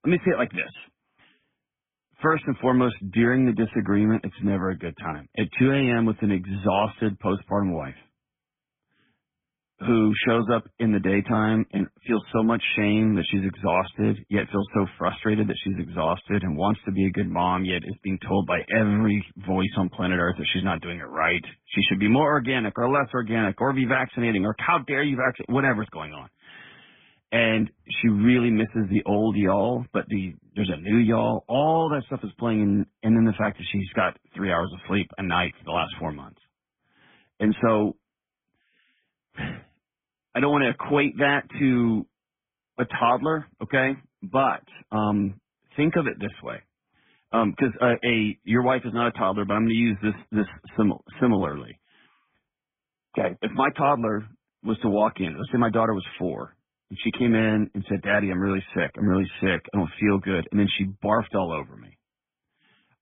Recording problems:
garbled, watery; badly
high frequencies cut off; severe; nothing above 3.5 kHz

